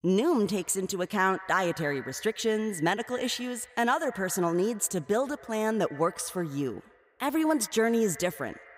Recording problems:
echo of what is said; noticeable; throughout; 120 ms later, 20 dB below the speech

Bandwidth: 15.5 kHz